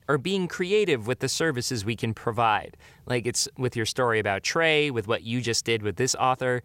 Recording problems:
none

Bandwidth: 16 kHz